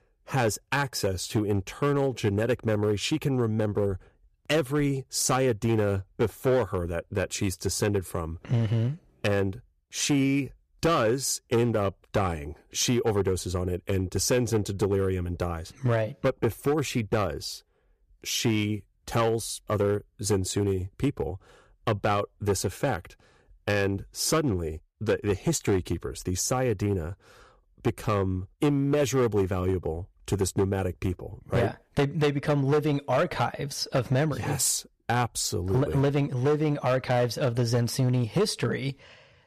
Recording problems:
distortion; slight; 6% of the sound clipped

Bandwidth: 14.5 kHz